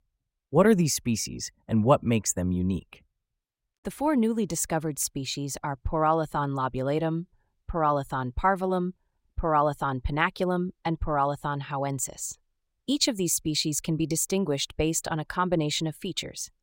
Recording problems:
none

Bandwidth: 16 kHz